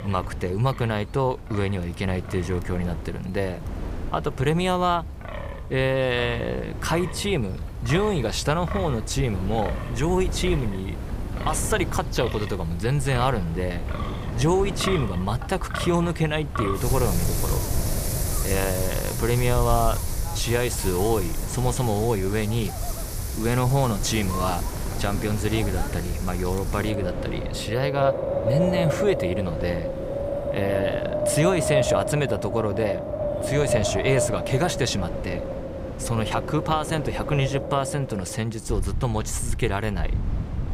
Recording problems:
wind in the background; loud; throughout; 4 dB below the speech

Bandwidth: 15 kHz